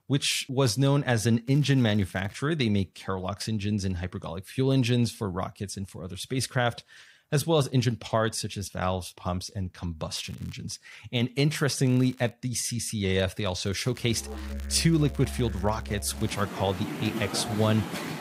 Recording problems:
background music; loud; from 14 s on; 9 dB below the speech
crackling; faint; 4 times, first at 1.5 s; 25 dB below the speech

